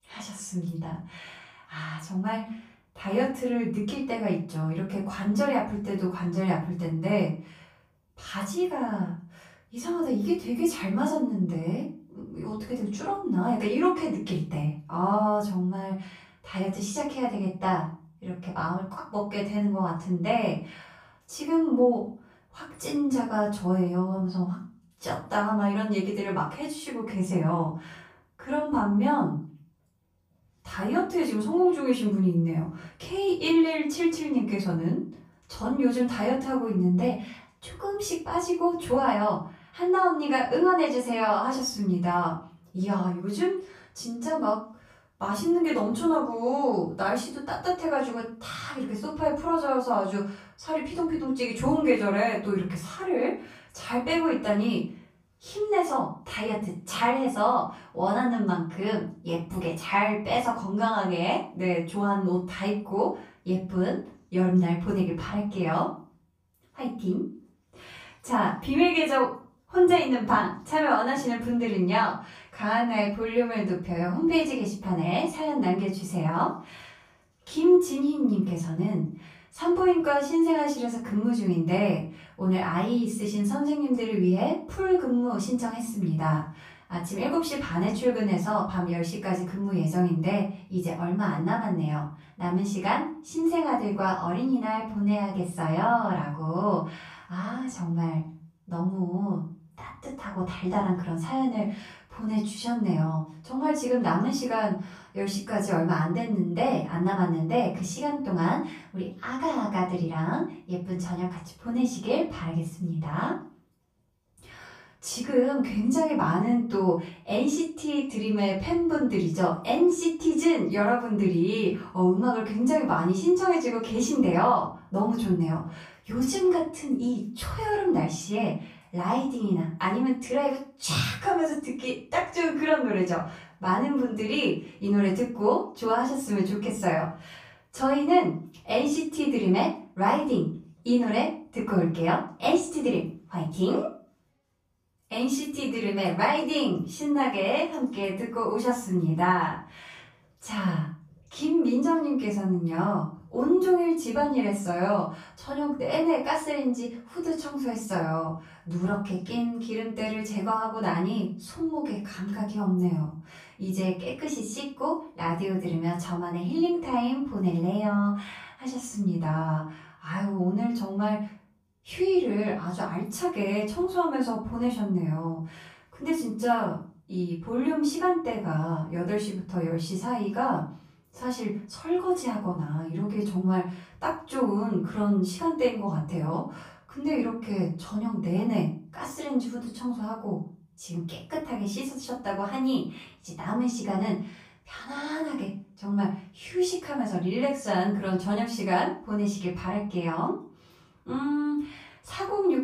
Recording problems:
off-mic speech; far
room echo; noticeable; dies away in 0.4 s

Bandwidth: 15 kHz